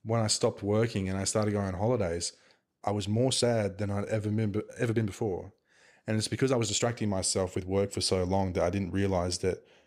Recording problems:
uneven, jittery; strongly; from 3 to 8 s

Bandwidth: 15.5 kHz